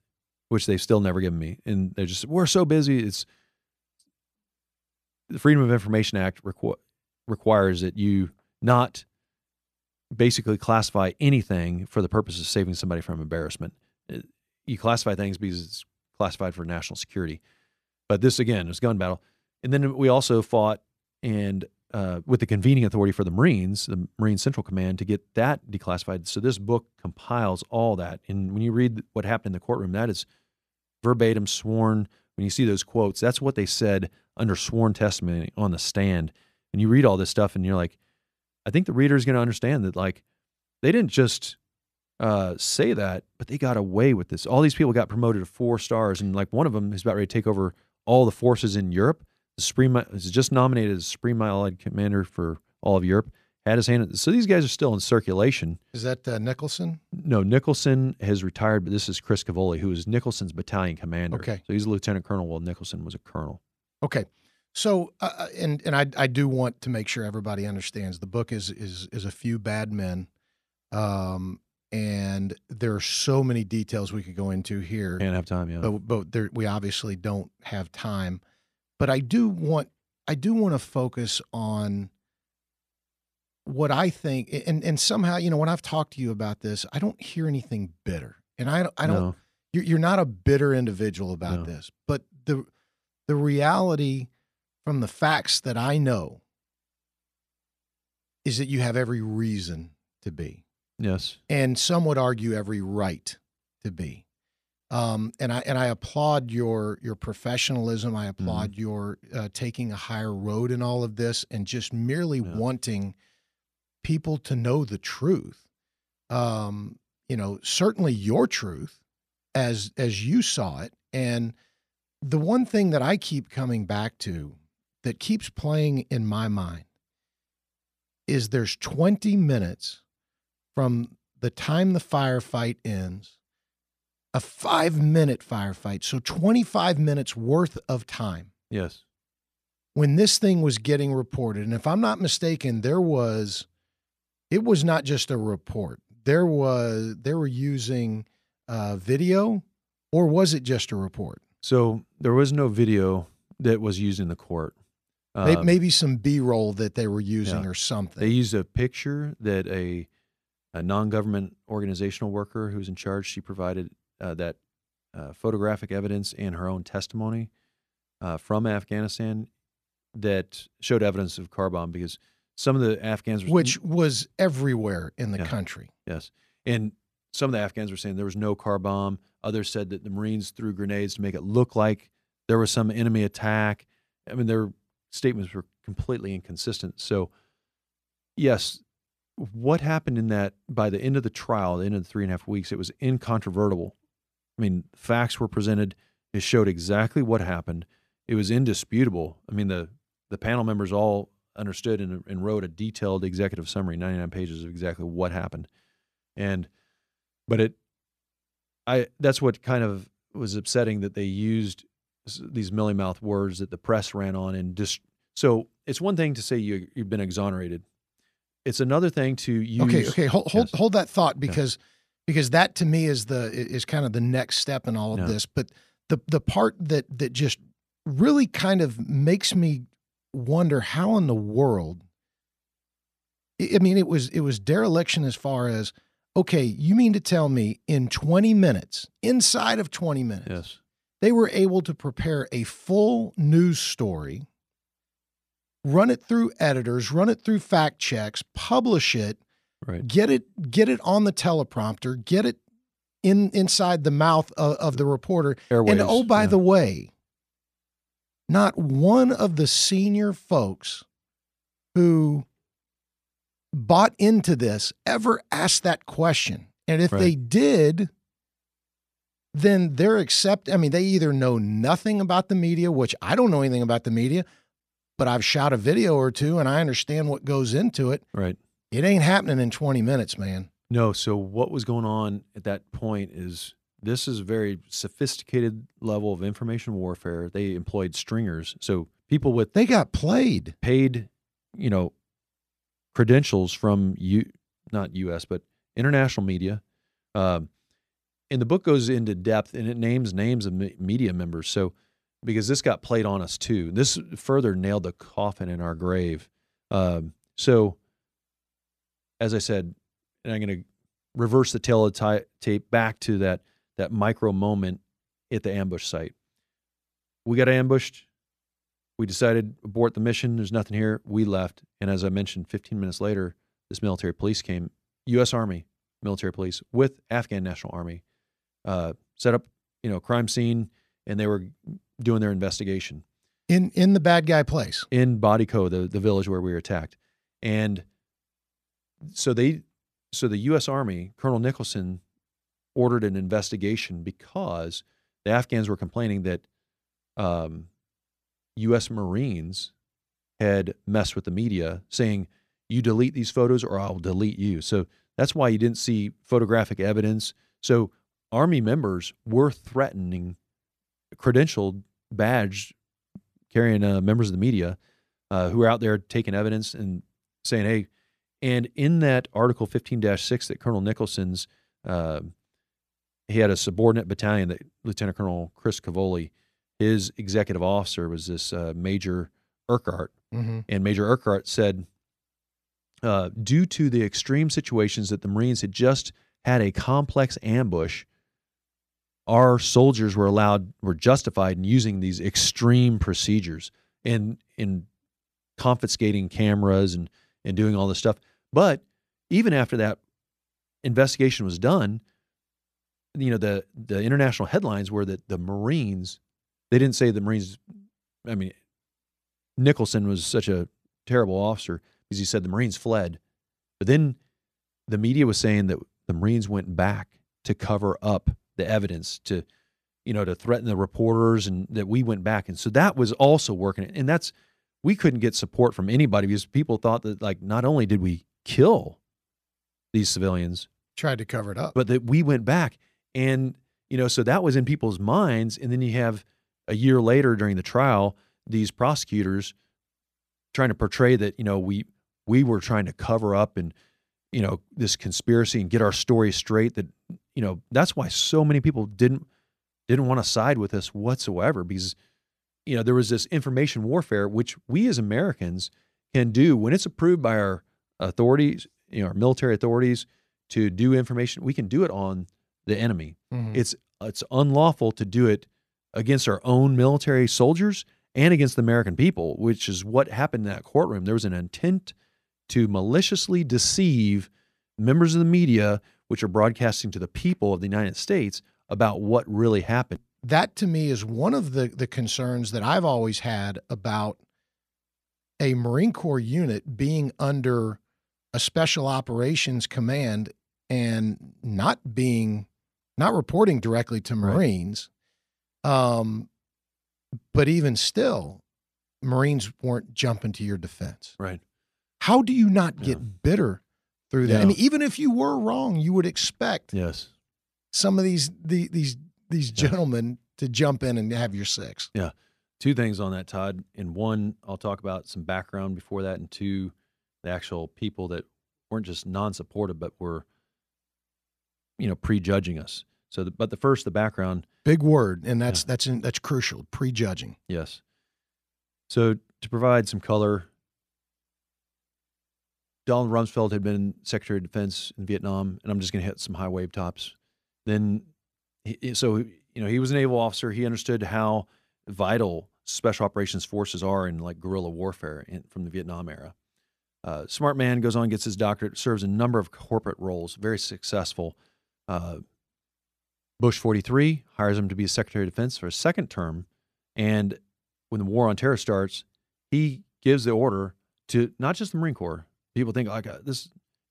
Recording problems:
none

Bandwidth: 14.5 kHz